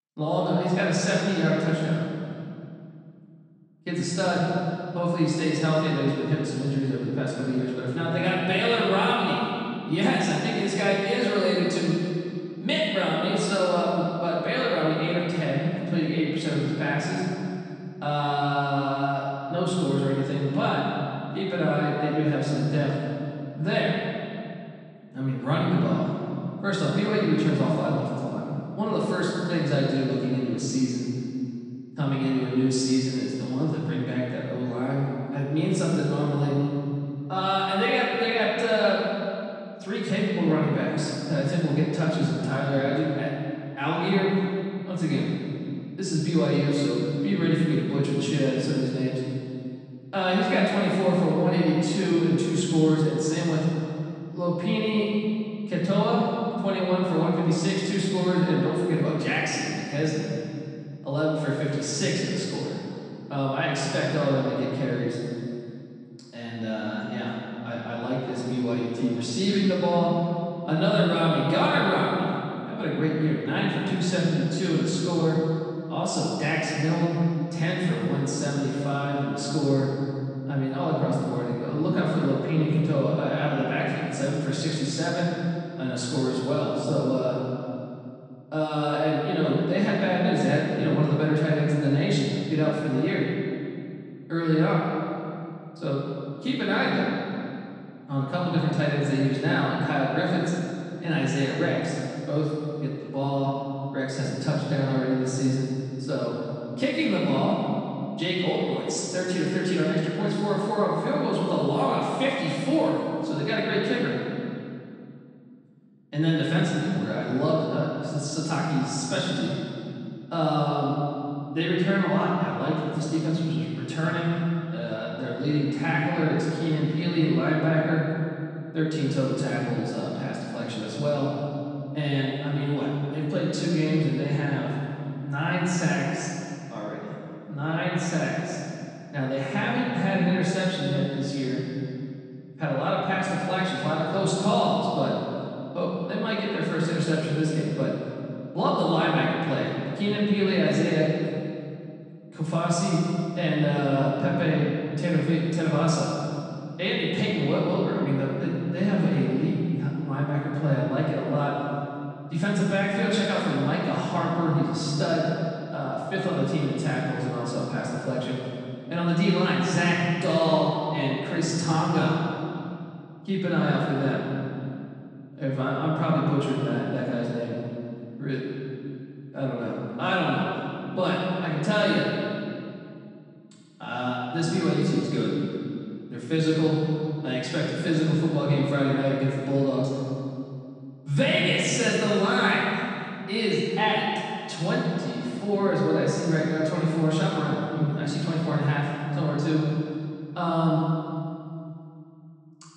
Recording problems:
room echo; strong; dies away in 2.4 s
off-mic speech; far

